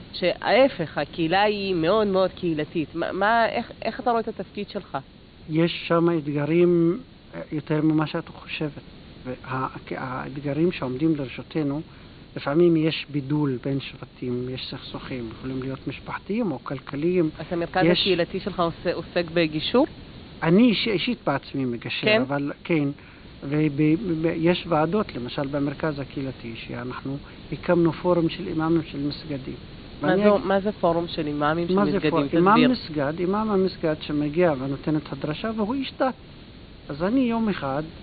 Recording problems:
high frequencies cut off; severe; nothing above 4.5 kHz
hiss; noticeable; throughout; 20 dB below the speech

